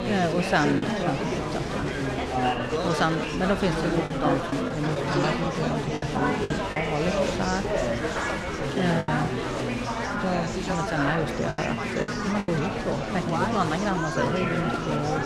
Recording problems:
chatter from many people; very loud; throughout; 1 dB above the speech
wind noise on the microphone; occasional gusts; 25 dB below the speech
choppy; very; 5% of the speech affected

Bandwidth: 15.5 kHz